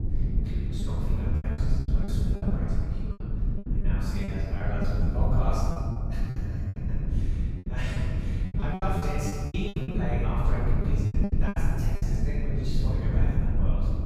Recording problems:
room echo; strong; dies away in 1.9 s
off-mic speech; far
low rumble; loud; throughout; 4 dB below the speech
choppy; very; 12% of the speech affected

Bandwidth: 15.5 kHz